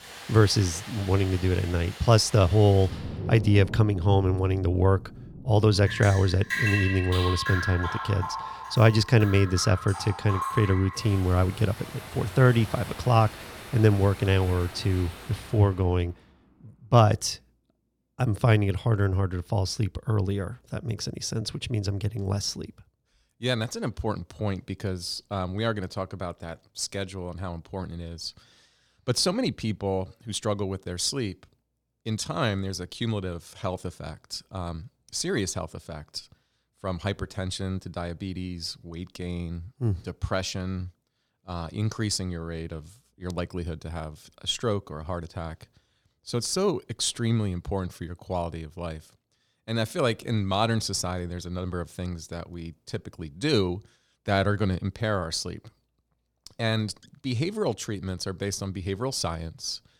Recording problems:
rain or running water; loud; until 15 s; 9 dB below the speech

